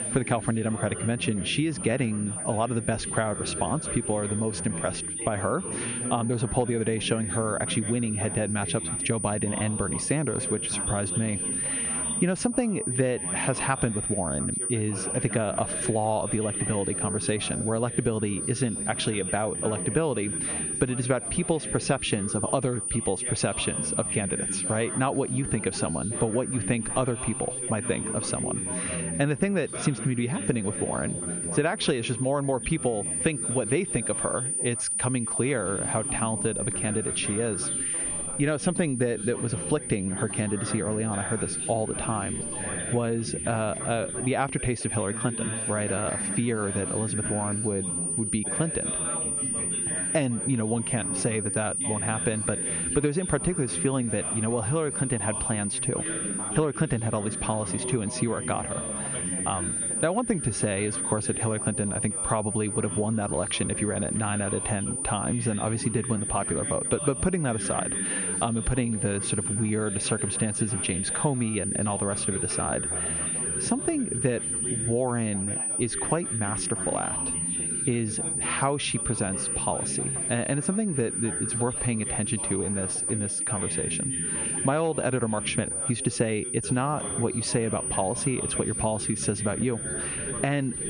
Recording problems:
muffled; very slightly; fading above 3 kHz
squashed, flat; somewhat
high-pitched whine; loud; throughout; 9.5 kHz, 1 dB below the speech
background chatter; noticeable; throughout; 3 voices, 10 dB below the speech

